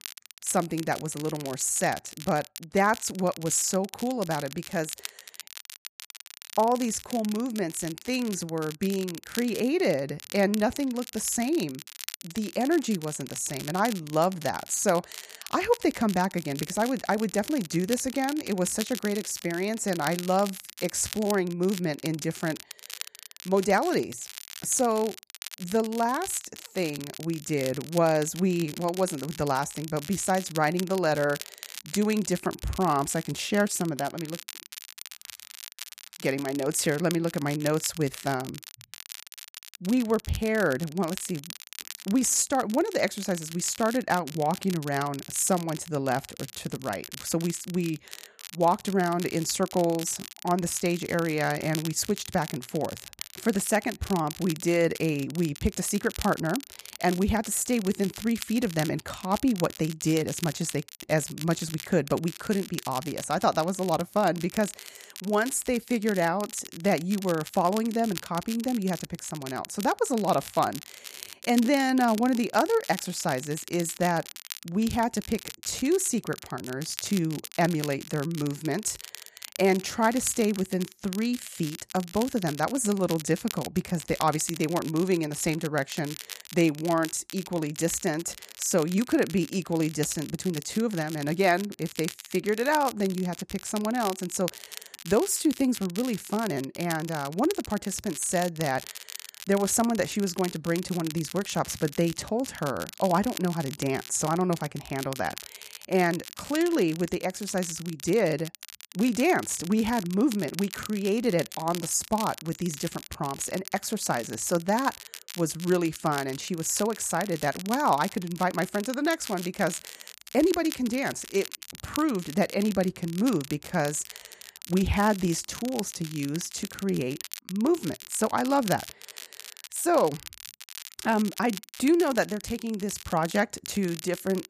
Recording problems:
crackle, like an old record; noticeable; 15 dB below the speech

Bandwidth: 14.5 kHz